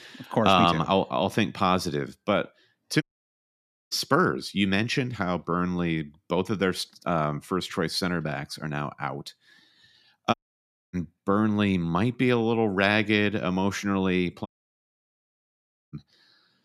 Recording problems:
audio cutting out; at 3 s for 1 s, at 10 s for 0.5 s and at 14 s for 1.5 s

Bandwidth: 14 kHz